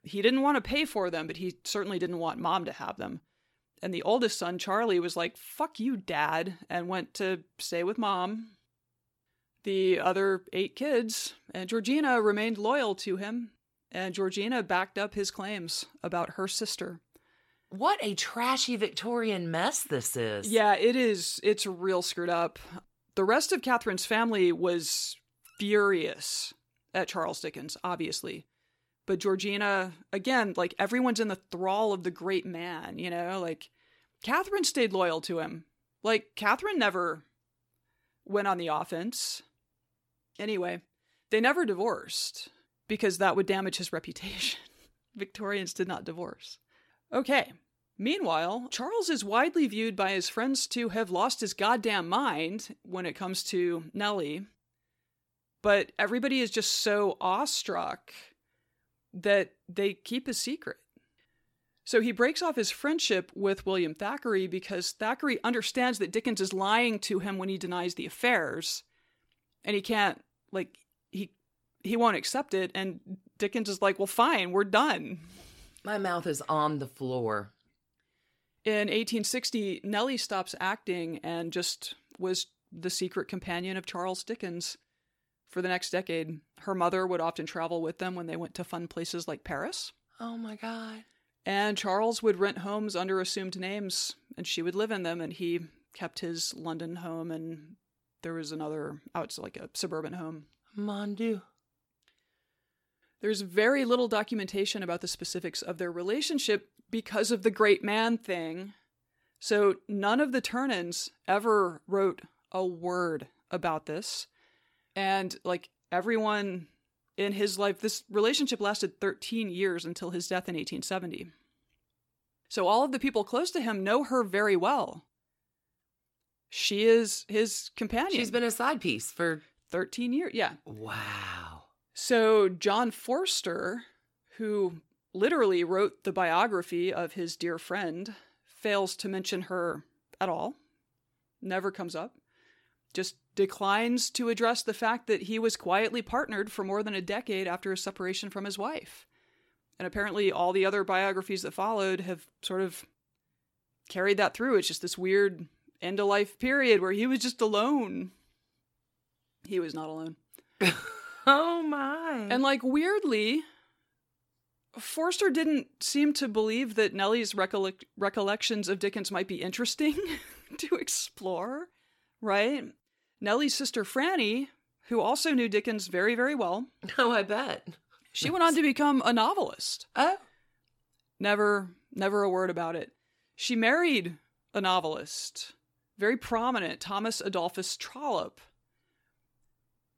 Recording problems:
none

